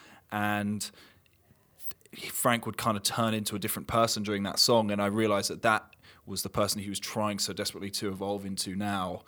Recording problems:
none

